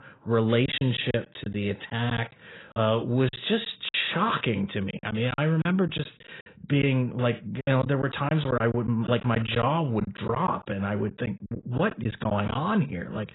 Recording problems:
garbled, watery; badly; nothing above 4 kHz
choppy; very; 9% of the speech affected

